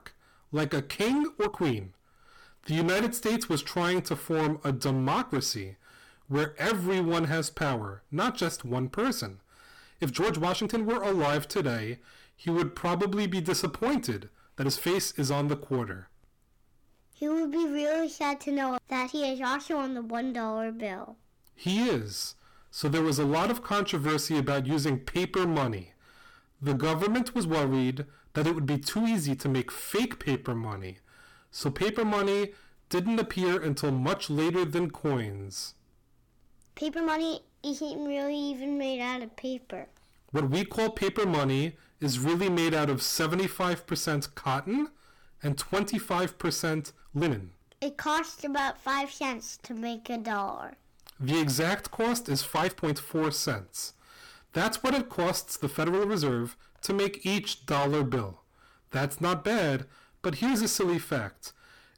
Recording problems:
distortion; heavy; 15% of the sound clipped
uneven, jittery; strongly; from 1.5 to 58 s

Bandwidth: 18.5 kHz